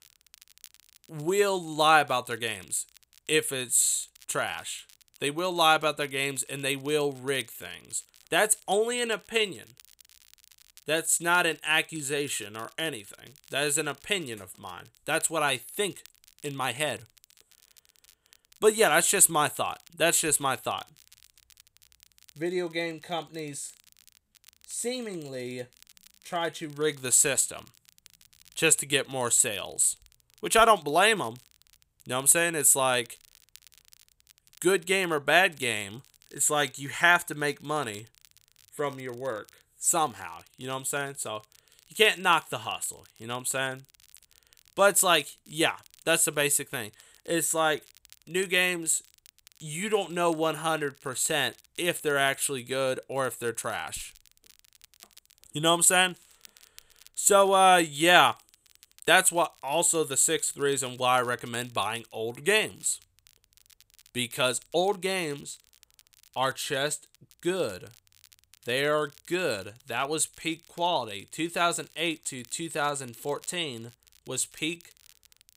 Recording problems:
crackle, like an old record; faint; 30 dB below the speech

